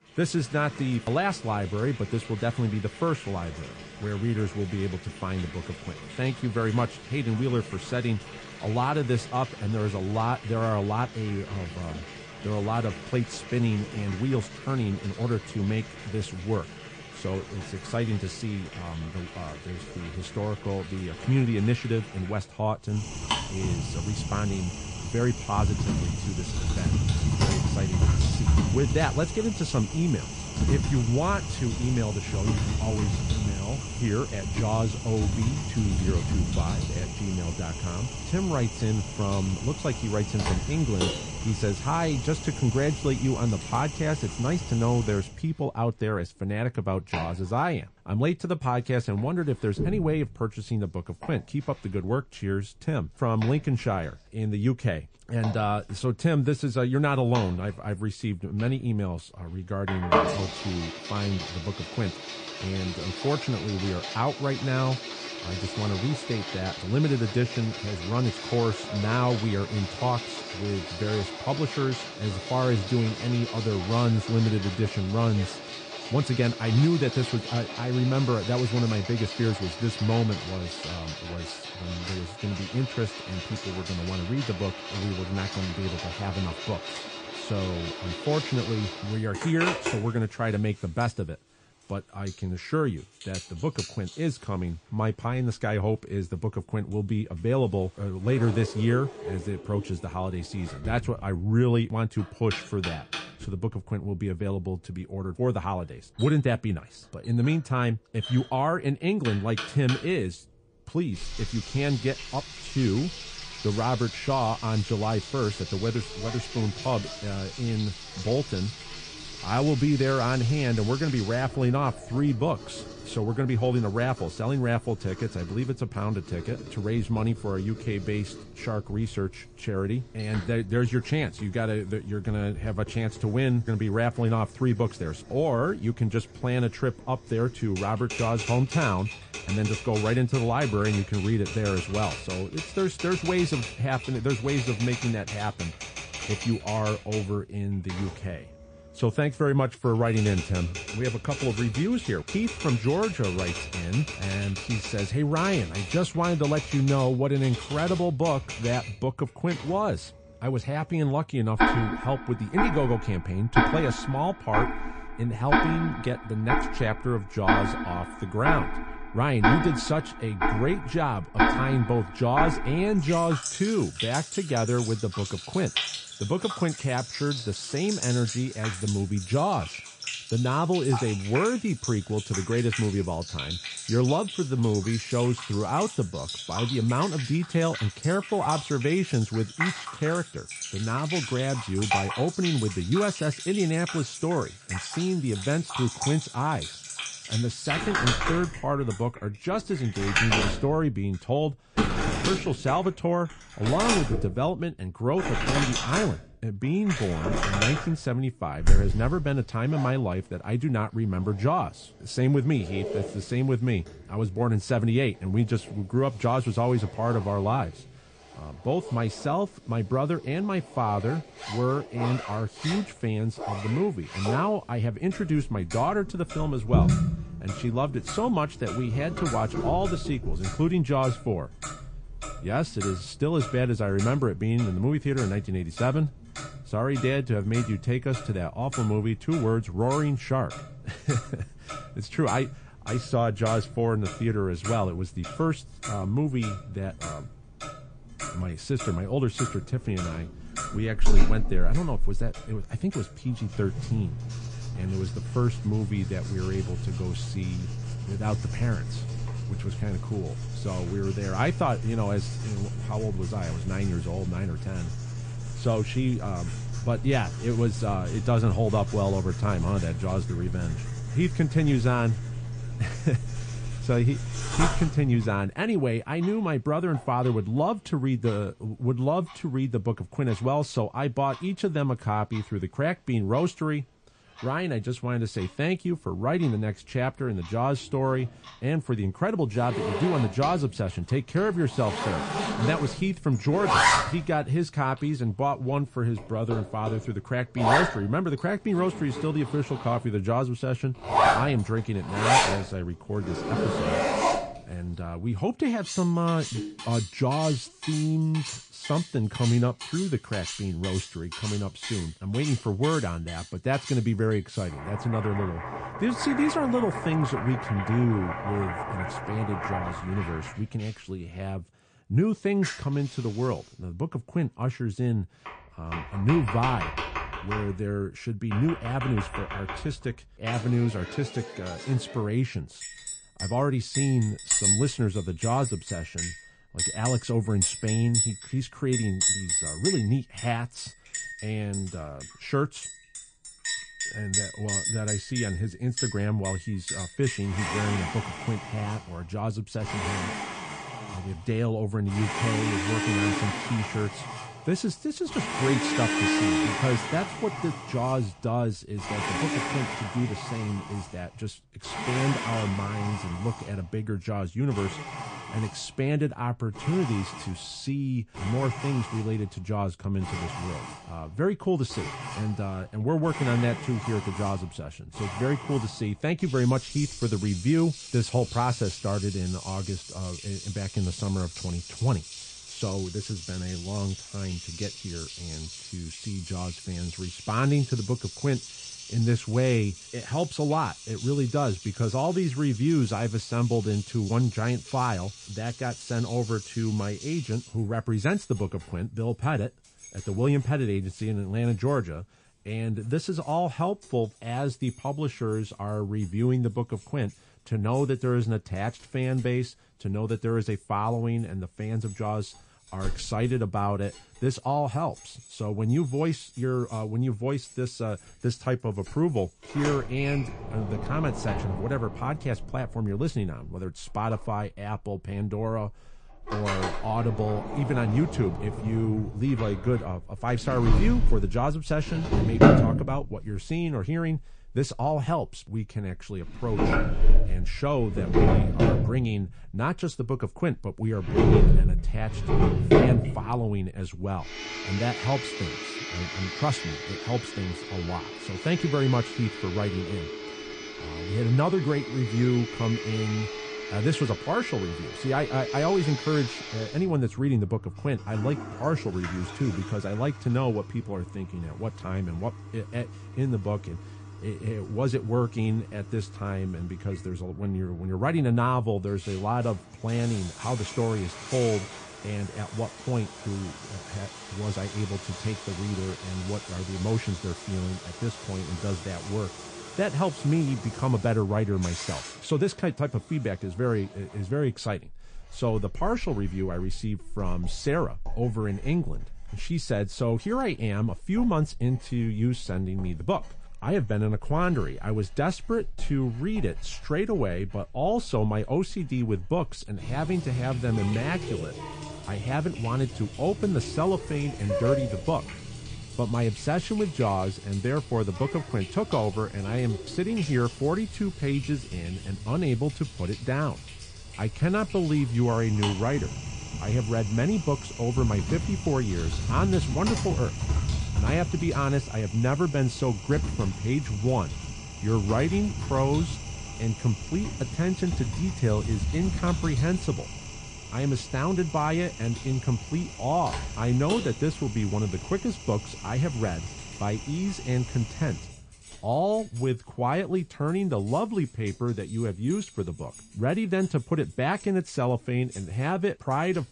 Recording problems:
garbled, watery; slightly; nothing above 9.5 kHz
household noises; loud; throughout; 5 dB below the speech

